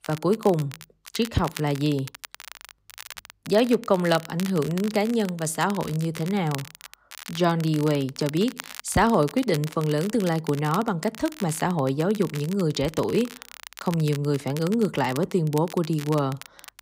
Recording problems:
crackle, like an old record; noticeable; 15 dB below the speech

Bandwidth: 15.5 kHz